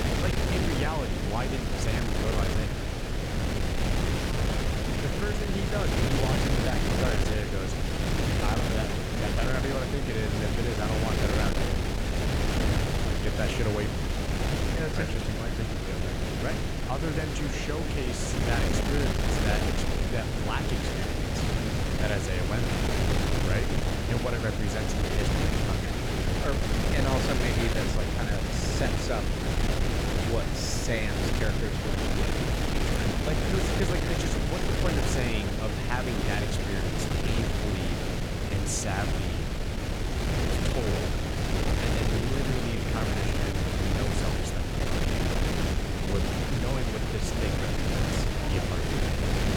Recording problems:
wind noise on the microphone; heavy; 4 dB above the speech
chatter from many people; noticeable; throughout; 15 dB below the speech

